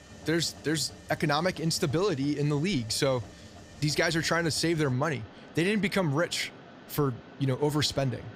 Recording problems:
machinery noise; noticeable; throughout; 20 dB below the speech

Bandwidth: 15.5 kHz